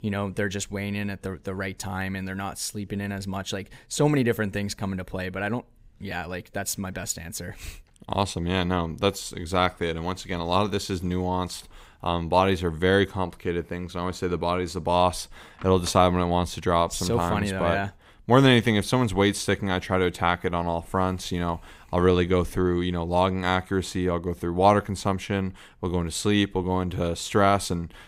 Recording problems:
none

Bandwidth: 15.5 kHz